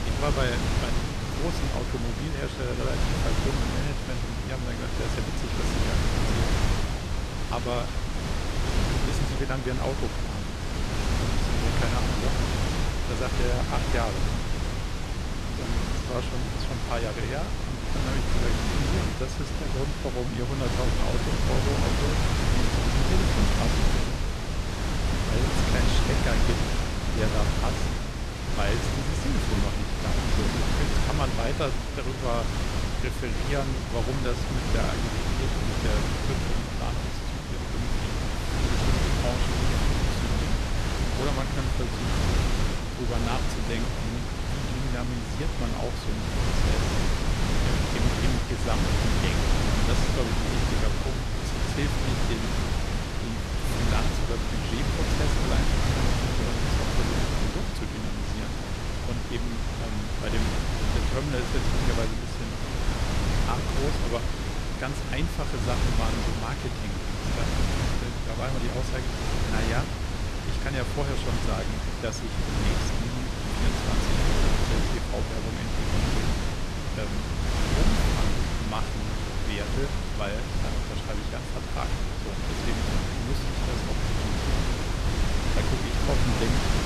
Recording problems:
wind noise on the microphone; heavy; 4 dB above the speech

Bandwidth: 13.5 kHz